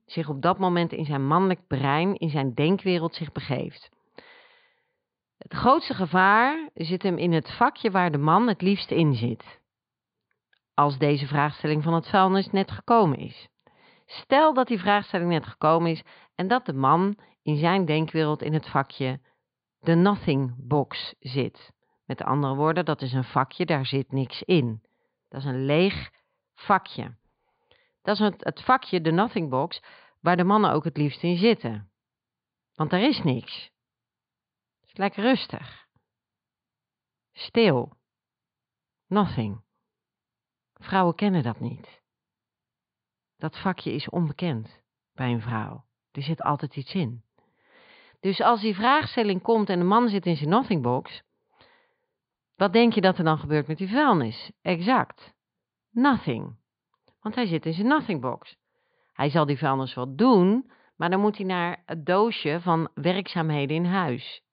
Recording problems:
high frequencies cut off; severe; nothing above 4.5 kHz

